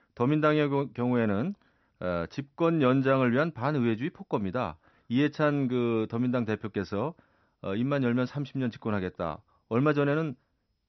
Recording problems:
high frequencies cut off; noticeable; nothing above 6 kHz

